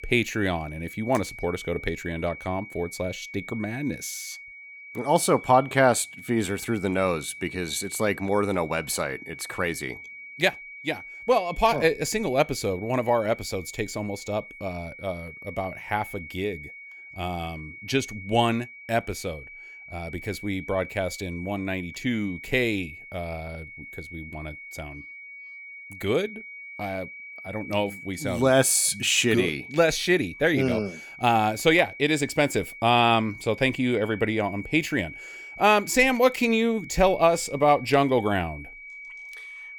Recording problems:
high-pitched whine; noticeable; throughout; 2.5 kHz, 15 dB below the speech

